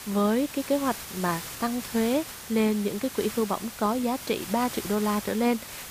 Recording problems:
hiss; loud; throughout; 10 dB below the speech

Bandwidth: 15 kHz